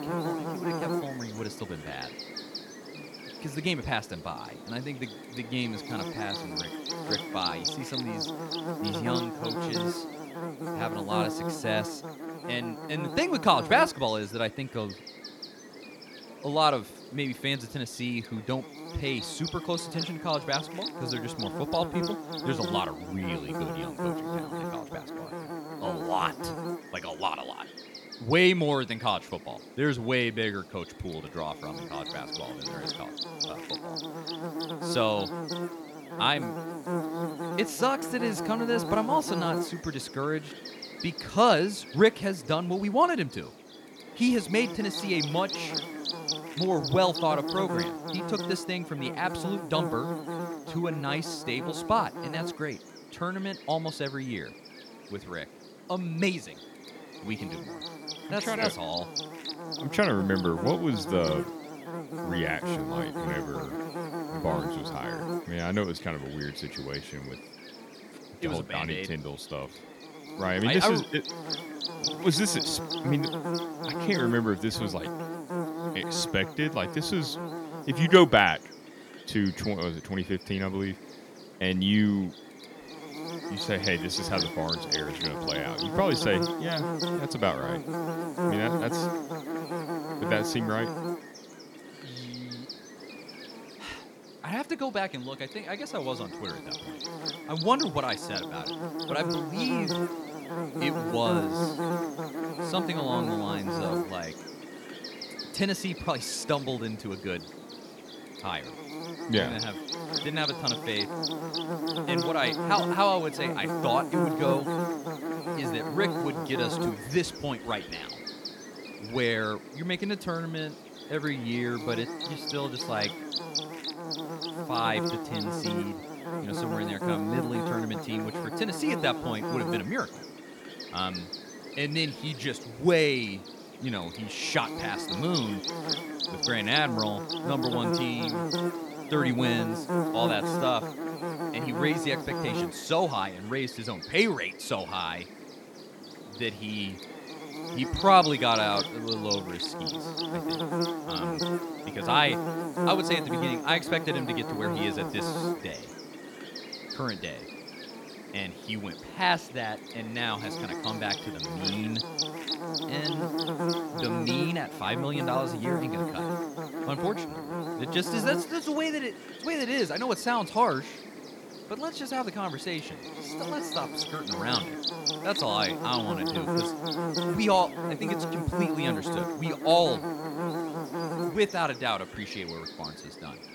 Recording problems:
electrical hum; loud; throughout; 50 Hz, 5 dB below the speech

